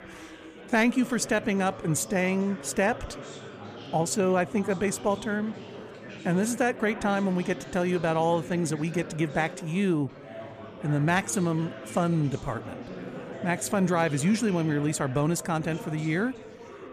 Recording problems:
chatter from many people; noticeable; throughout; 15 dB below the speech

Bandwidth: 14.5 kHz